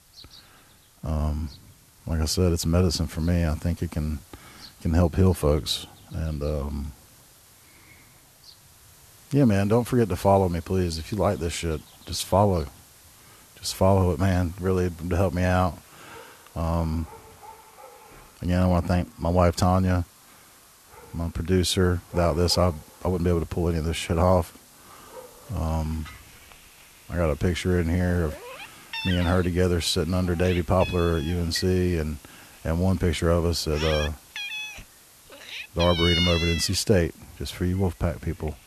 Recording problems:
animal sounds; loud; throughout; 9 dB below the speech
hiss; faint; throughout; 25 dB below the speech

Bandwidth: 13.5 kHz